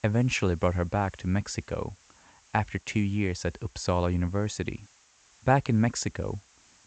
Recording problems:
high frequencies cut off; noticeable; nothing above 8 kHz
hiss; faint; throughout; 30 dB below the speech

